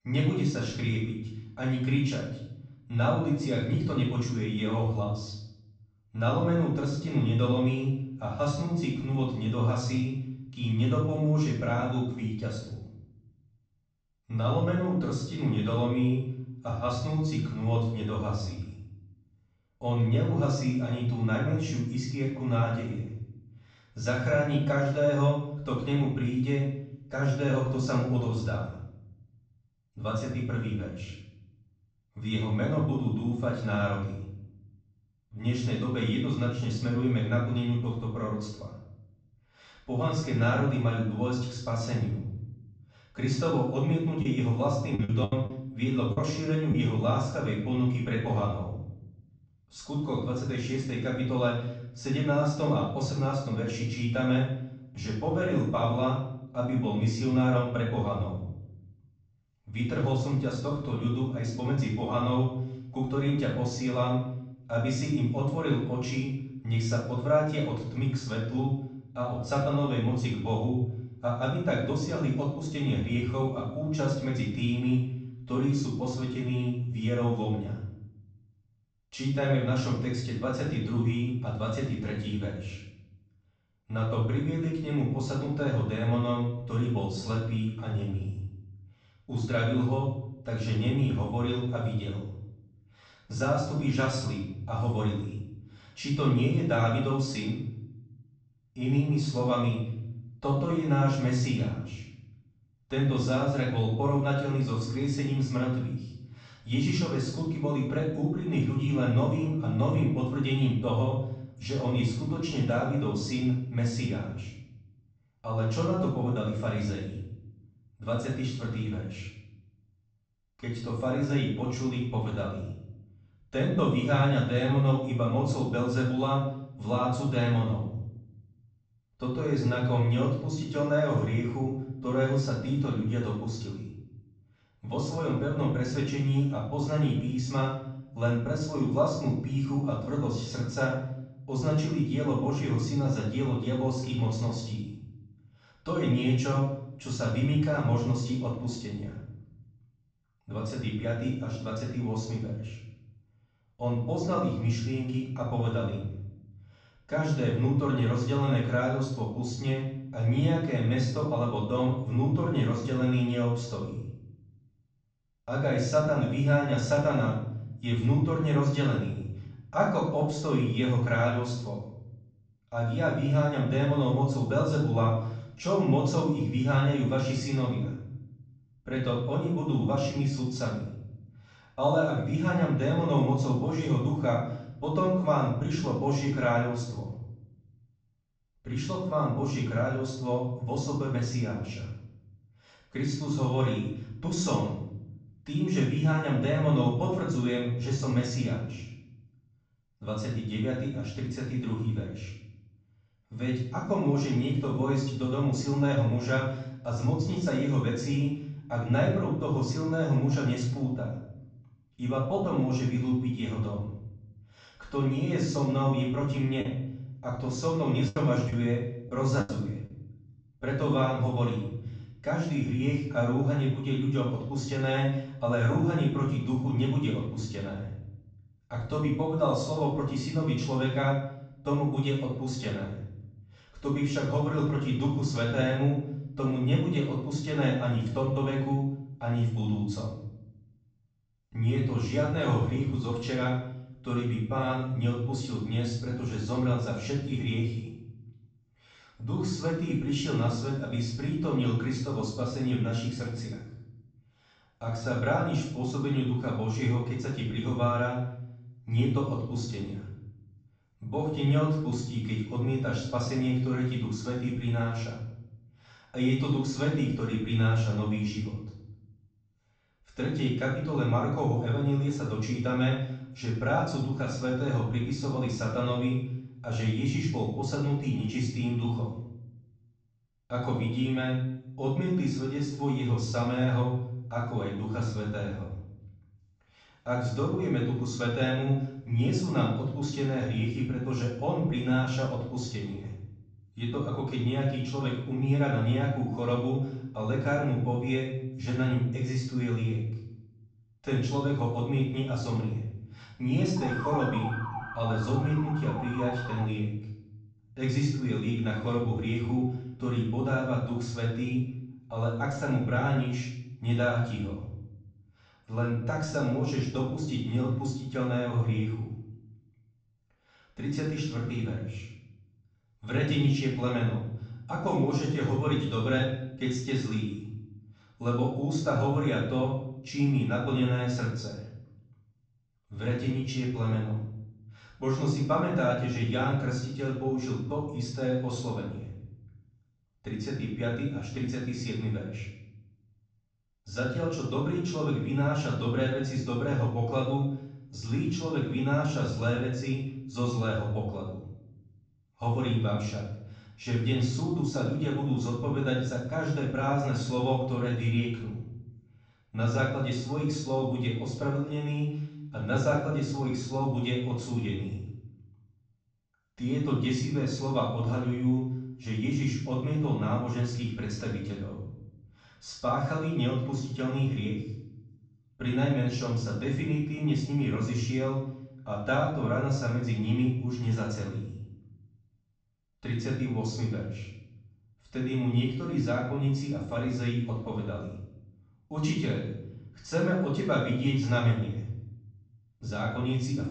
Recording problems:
off-mic speech; far
room echo; noticeable; dies away in 0.9 s
high frequencies cut off; noticeable; nothing above 8 kHz
choppy; very; from 44 to 47 s and from 3:37 to 3:39; 9% of the speech affected
siren; noticeable; from 5:04 to 5:07; peak 5 dB below the speech

